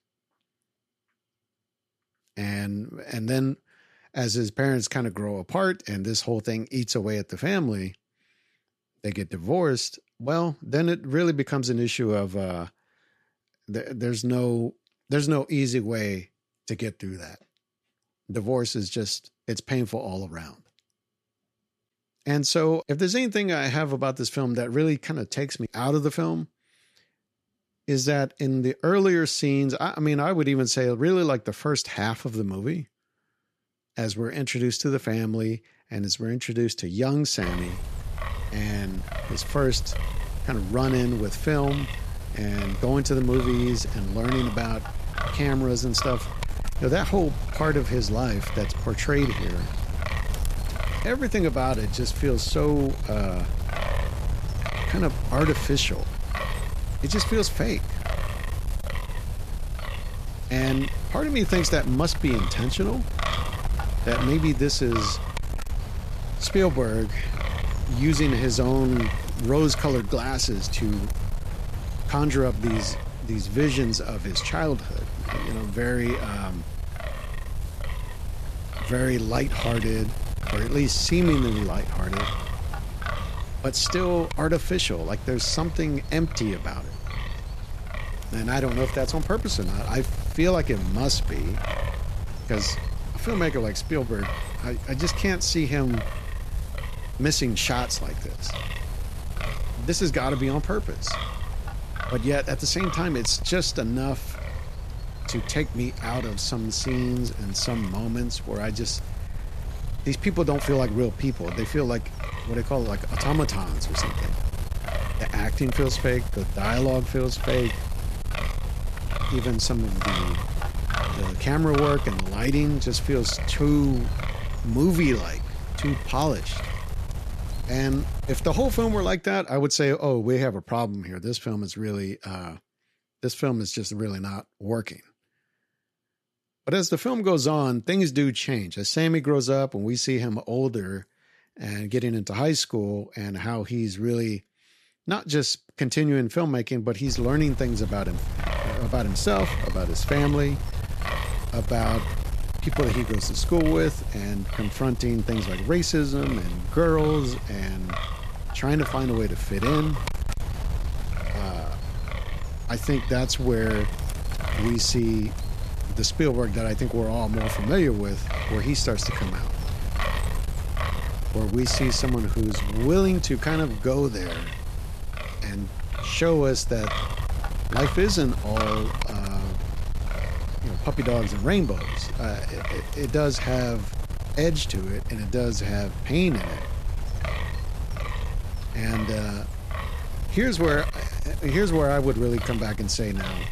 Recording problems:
wind noise on the microphone; heavy; from 37 s to 2:09 and from 2:27 on; 8 dB below the speech

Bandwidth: 14.5 kHz